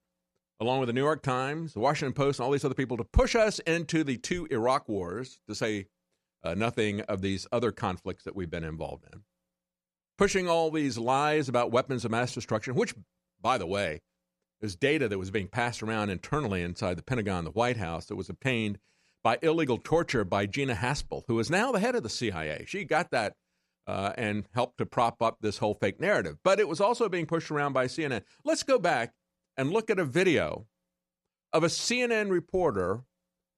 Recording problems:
none

